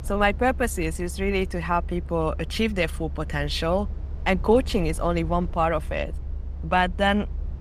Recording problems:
low rumble; faint; throughout; 25 dB below the speech

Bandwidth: 15 kHz